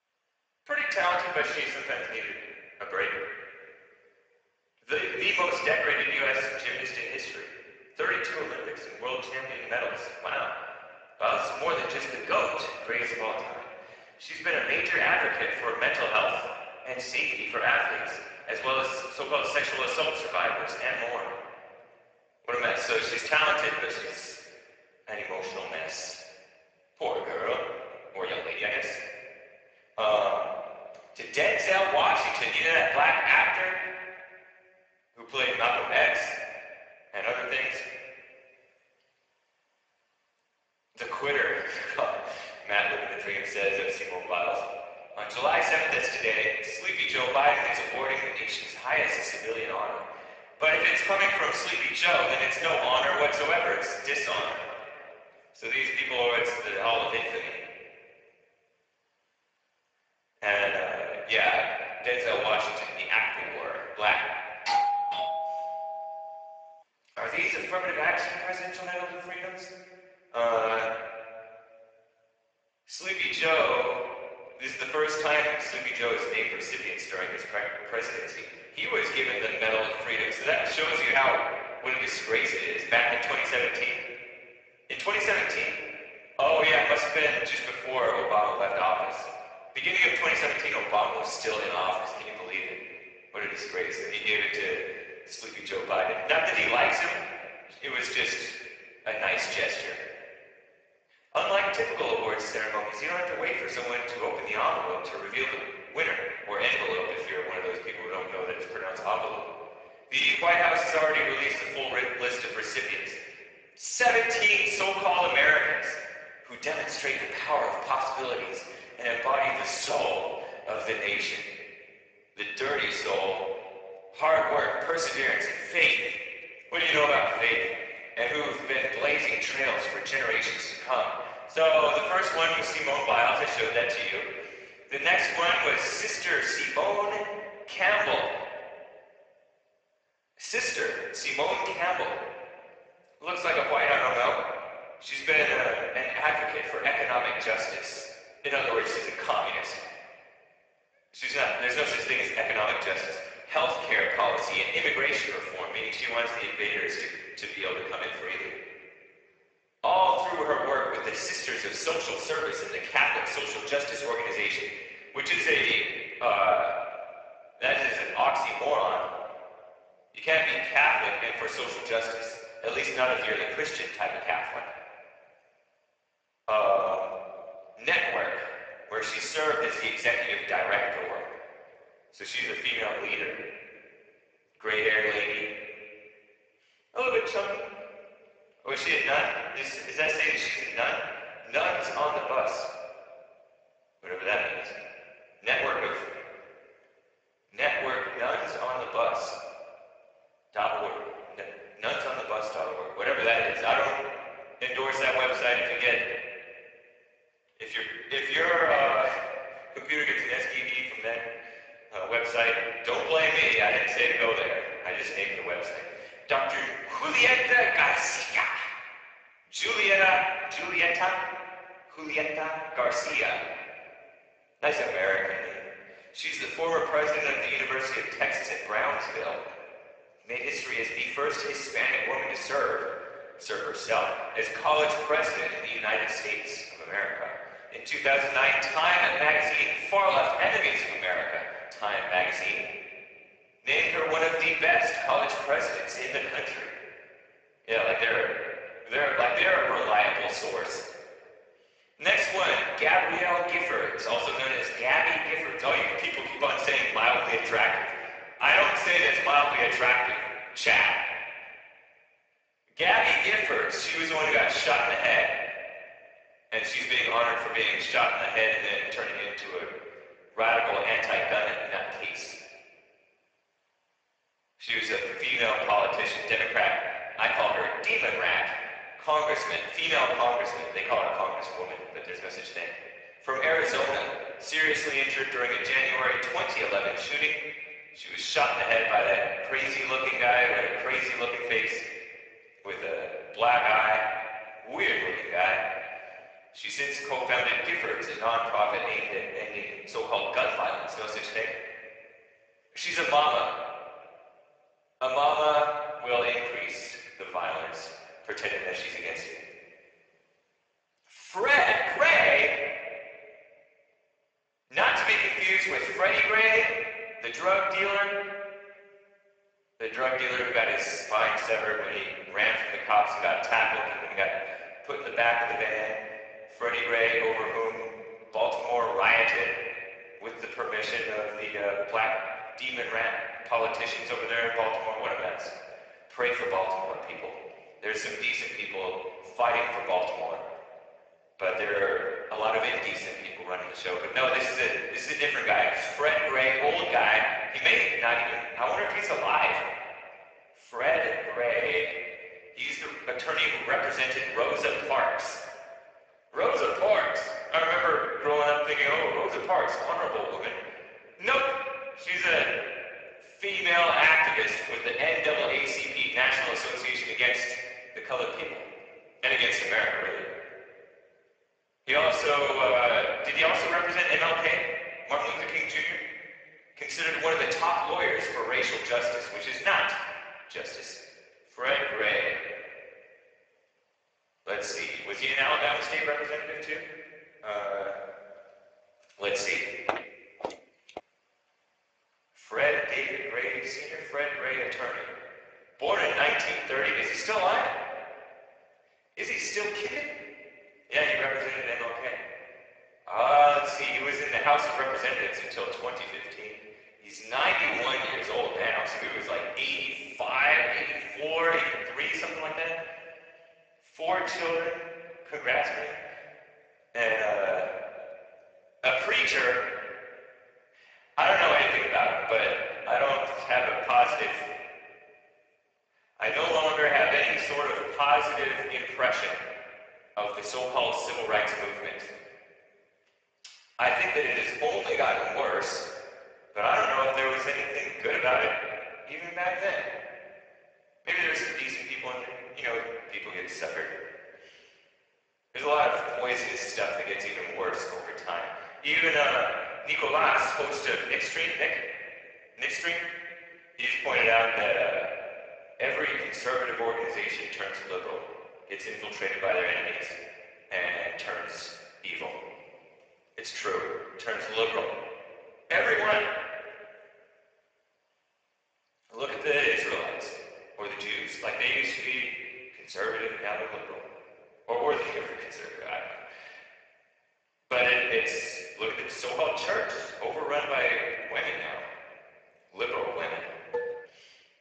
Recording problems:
garbled, watery; badly; nothing above 7.5 kHz
thin; very; fading below 750 Hz
room echo; noticeable; dies away in 1.5 s
off-mic speech; somewhat distant
uneven, jittery; strongly; from 0.5 s to 7:45
doorbell; loud; from 1:05 to 1:06; peak 1 dB above the speech
footsteps; noticeable; from 6:30 to 6:31; peak 7 dB below the speech
clattering dishes; noticeable; at 8:04; peak 8 dB below the speech

